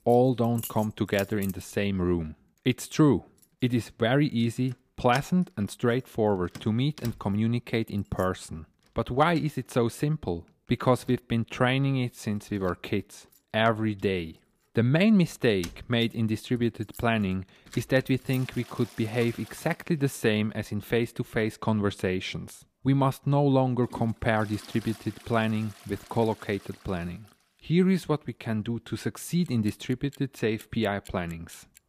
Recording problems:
household noises; faint; throughout; 20 dB below the speech

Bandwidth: 15 kHz